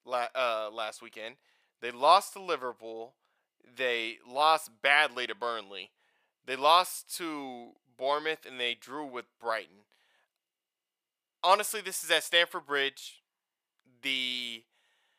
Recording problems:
thin; very; fading below 600 Hz

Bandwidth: 15 kHz